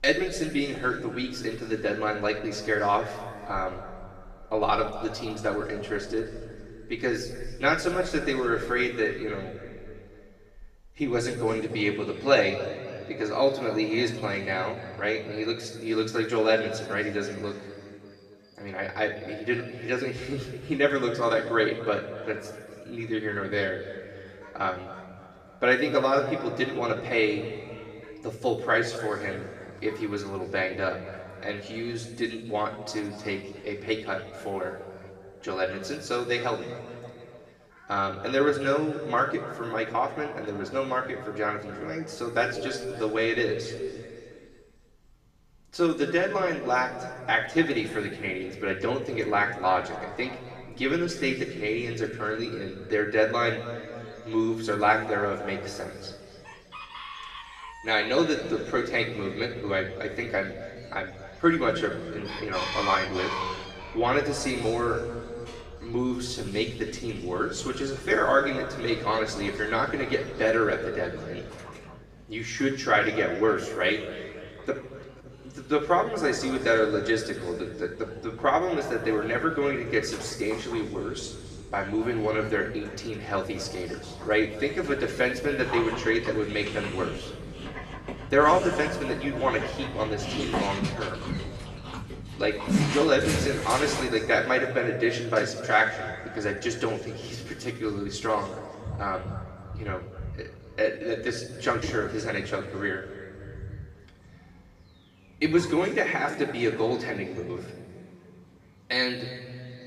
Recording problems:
off-mic speech; far
room echo; noticeable; dies away in 2.1 s
animal sounds; noticeable; throughout; 10 dB below the speech

